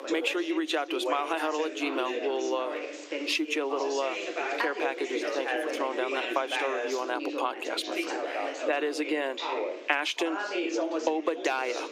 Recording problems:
thin; somewhat; fading below 300 Hz
squashed, flat; somewhat, background pumping
background chatter; loud; throughout; 3 voices, 3 dB below the speech

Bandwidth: 15 kHz